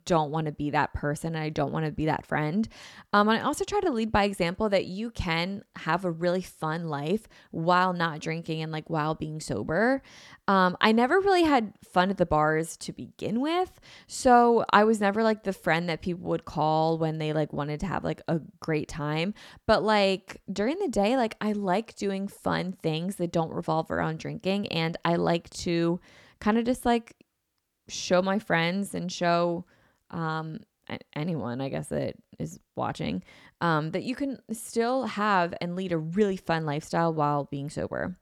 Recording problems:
none

